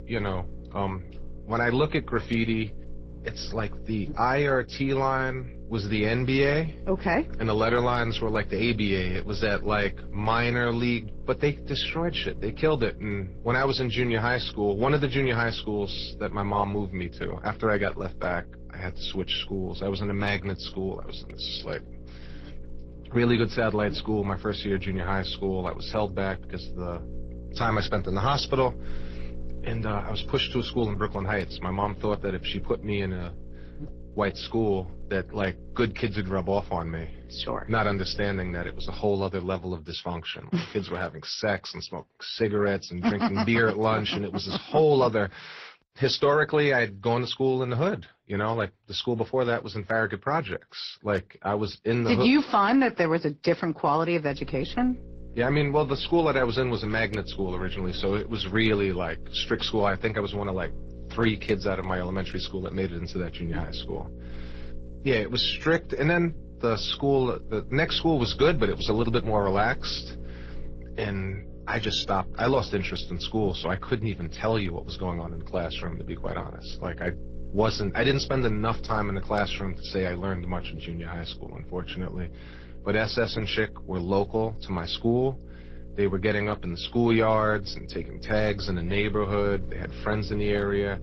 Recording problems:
garbled, watery; slightly; nothing above 5.5 kHz
electrical hum; faint; until 39 s and from 54 s on; 60 Hz, 20 dB below the speech

